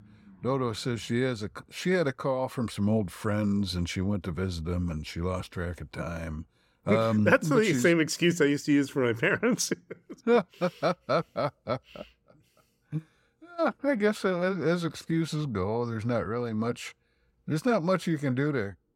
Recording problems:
none

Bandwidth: 16.5 kHz